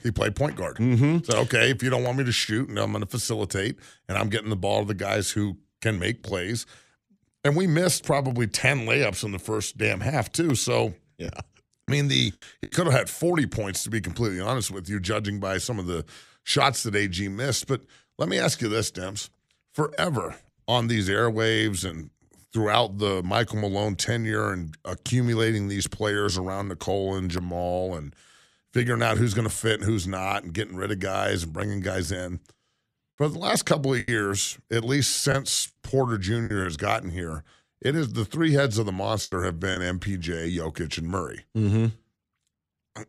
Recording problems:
choppy; very; from 11 to 13 s, from 34 to 37 s and at 39 s; 6% of the speech affected

